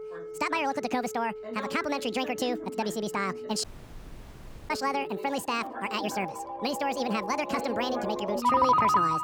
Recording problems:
wrong speed and pitch; too fast and too high; 1.7 times normal speed
alarms or sirens; loud; throughout; 1 dB below the speech
voice in the background; noticeable; throughout; 10 dB below the speech
audio cutting out; at 3.5 s for 1 s

